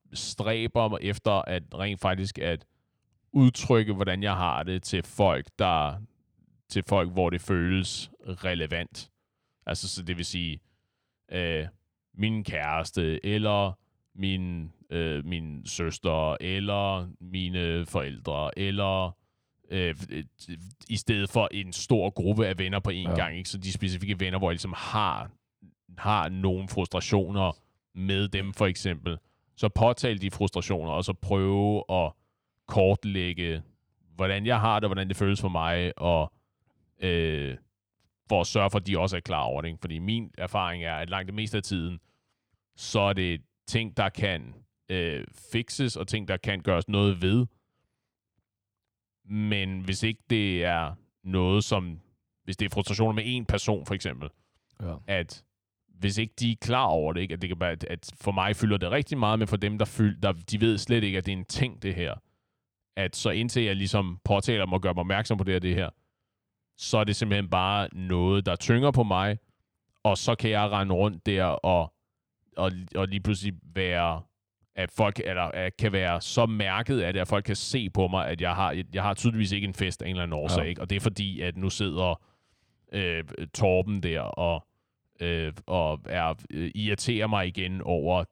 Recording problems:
none

